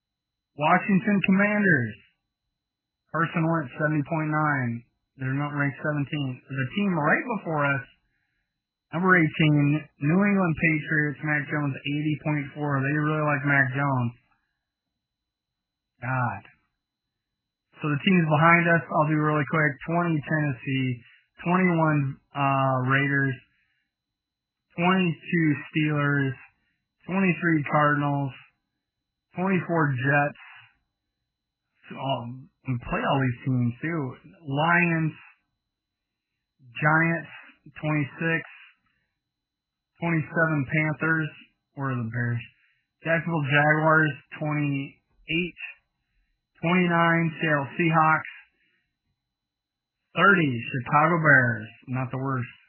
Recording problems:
garbled, watery; badly; nothing above 3 kHz

